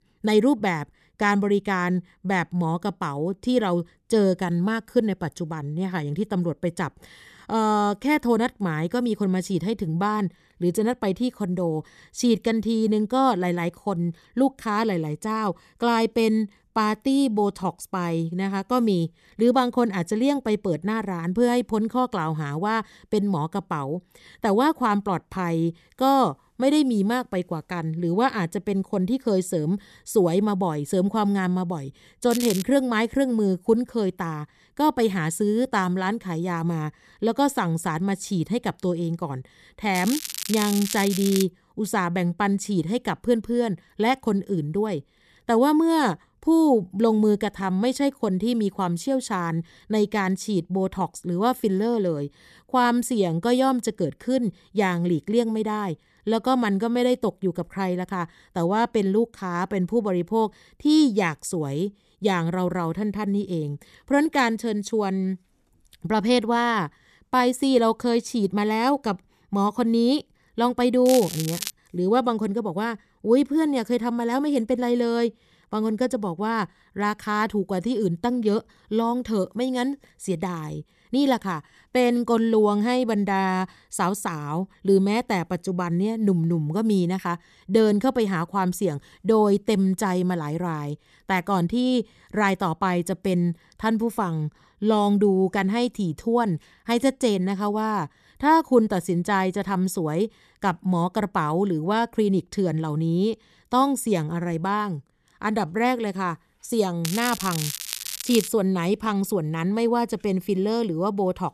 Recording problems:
crackling; loud; 4 times, first at 32 s; 7 dB below the speech

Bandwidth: 14 kHz